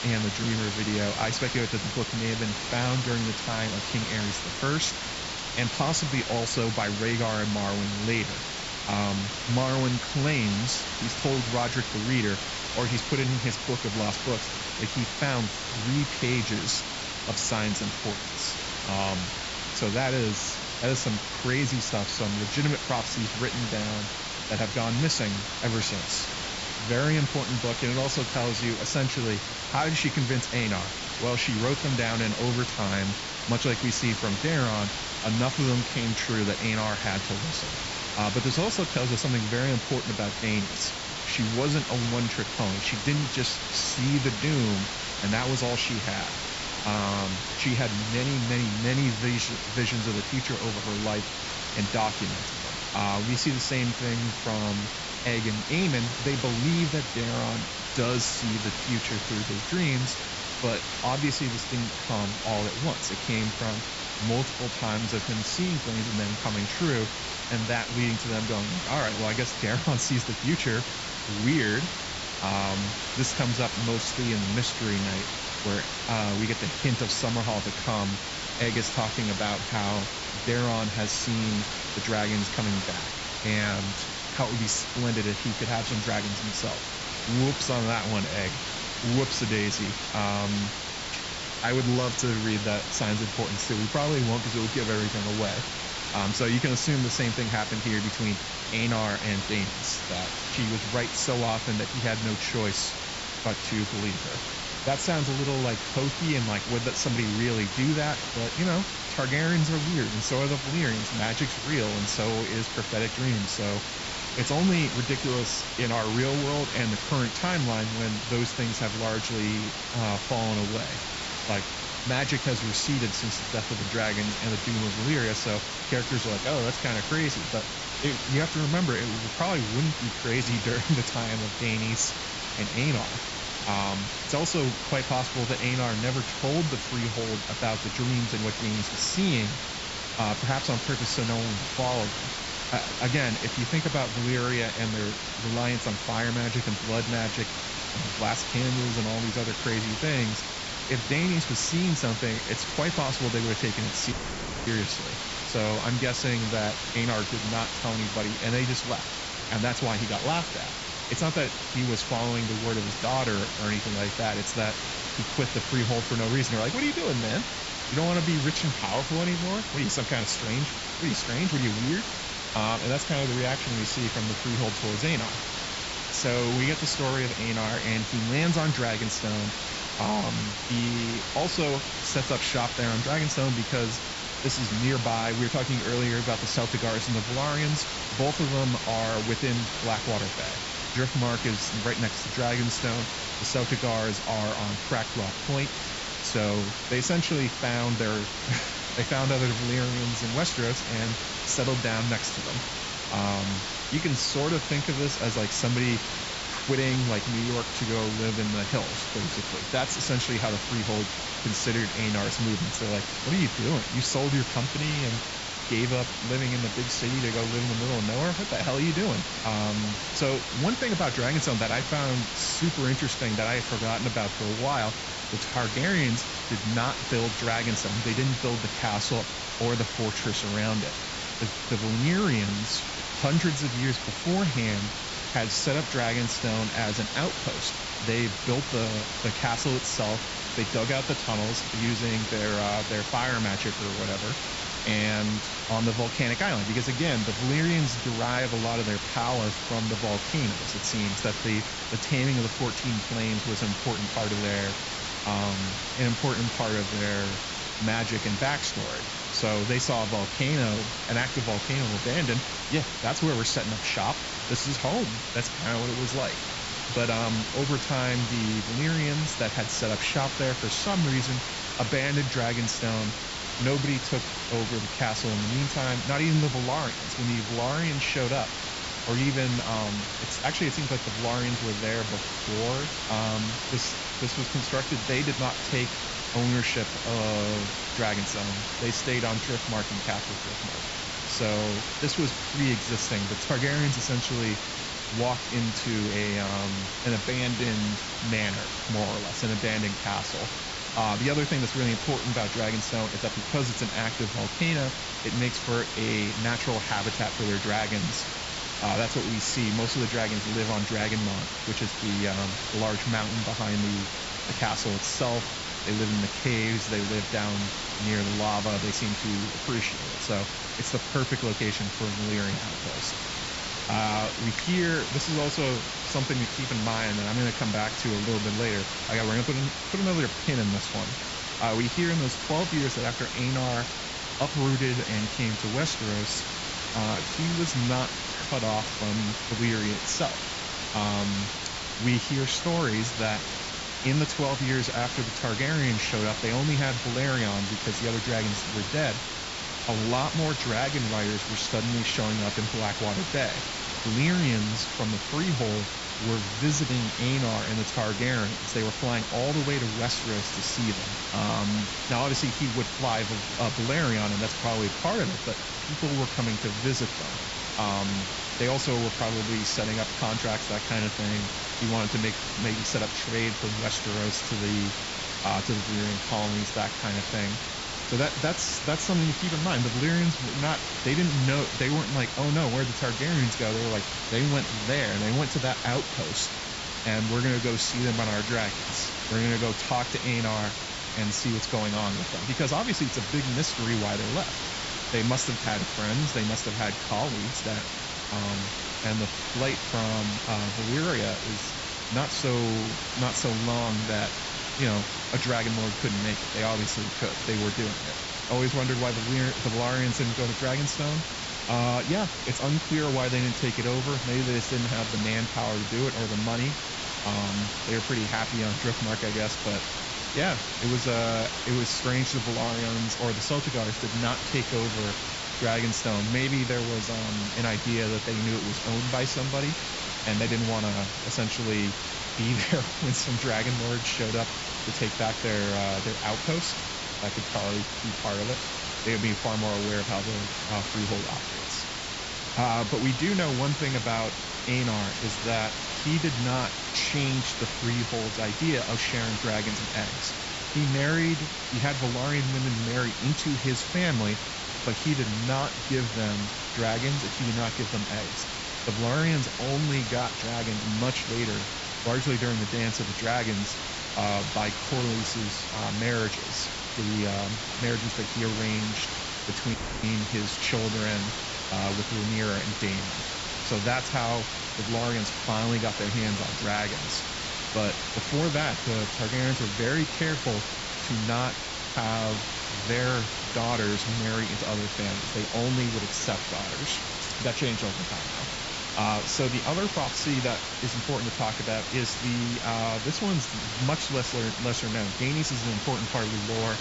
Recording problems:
high frequencies cut off; noticeable; nothing above 8 kHz
hiss; loud; throughout; 2 dB below the speech
audio cutting out; at 2:34 for 0.5 s and at 7:50

